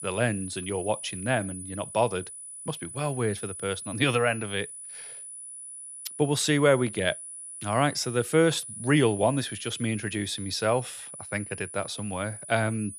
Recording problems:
high-pitched whine; noticeable; throughout; 10 kHz, 10 dB below the speech

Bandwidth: 14.5 kHz